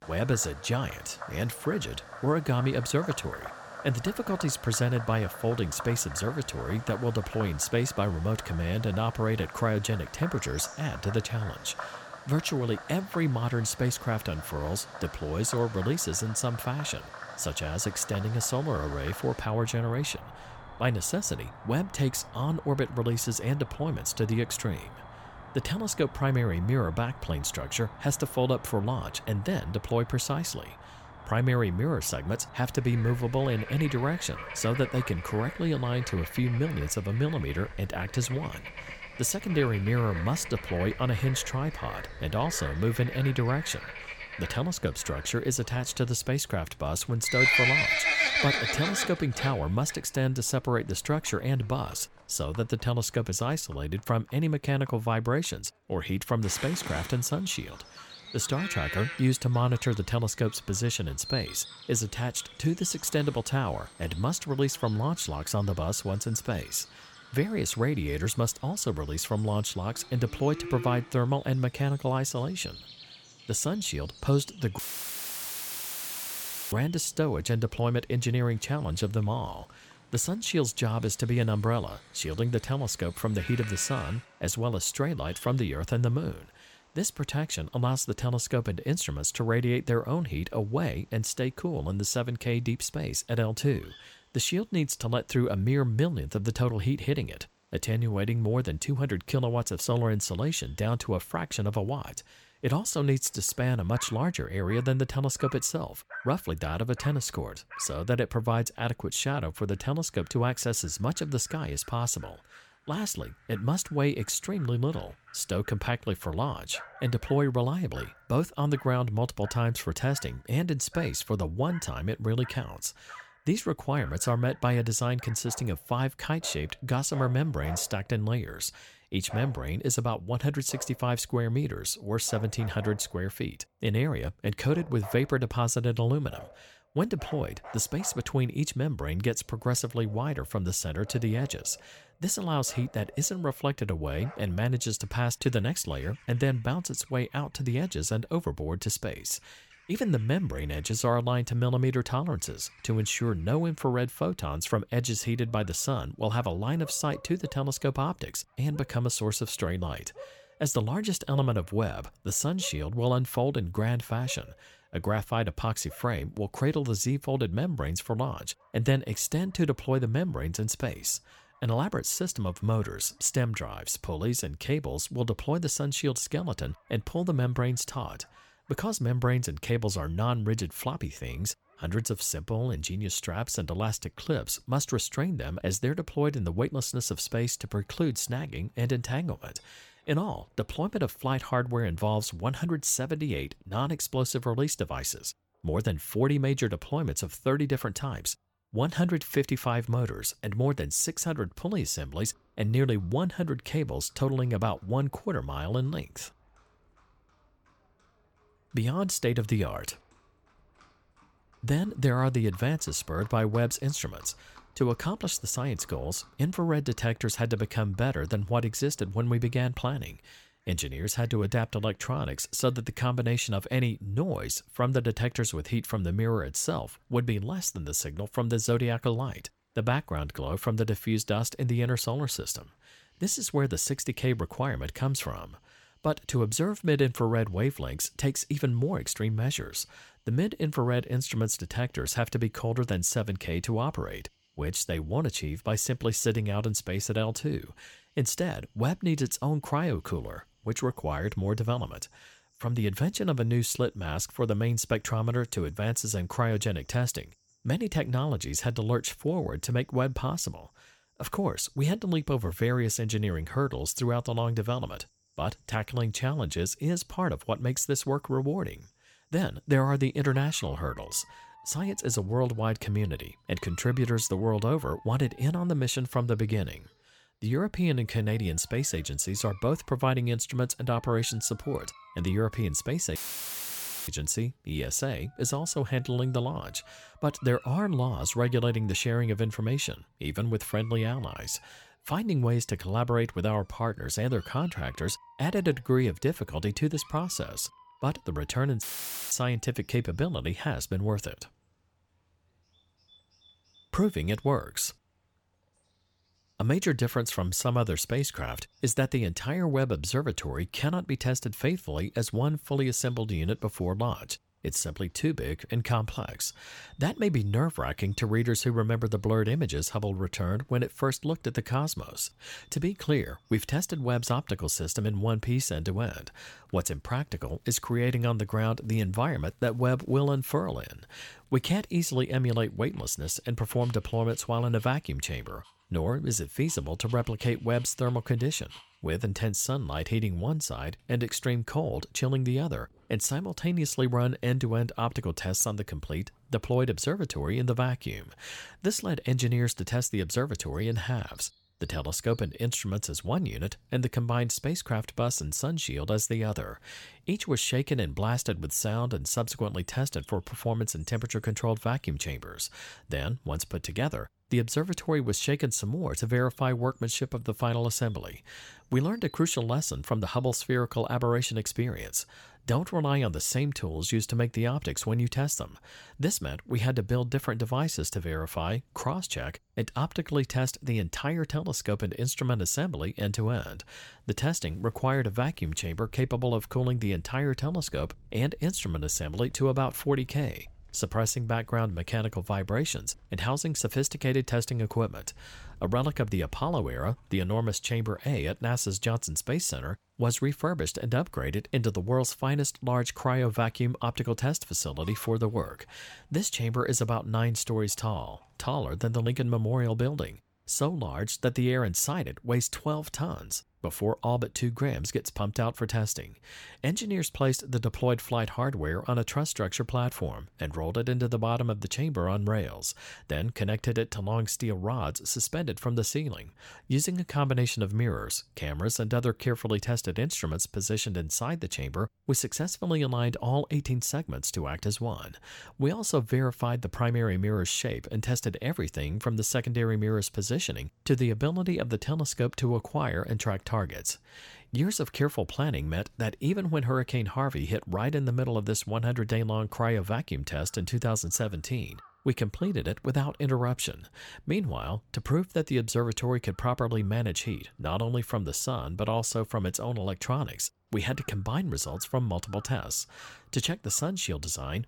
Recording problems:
animal sounds; noticeable; throughout; 10 dB below the speech
audio cutting out; filled with static; at 1:15 for 2 s, at 4:43 for 1 s and at 4:59

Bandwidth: 18 kHz